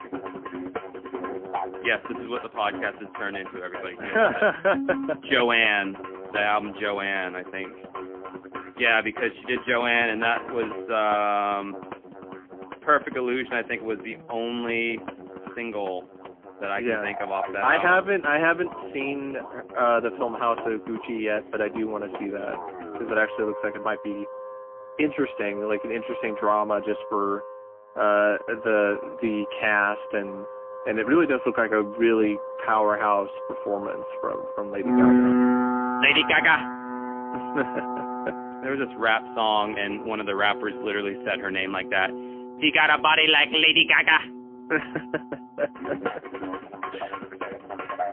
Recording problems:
phone-call audio; poor line; nothing above 3.5 kHz
background music; loud; throughout; 9 dB below the speech

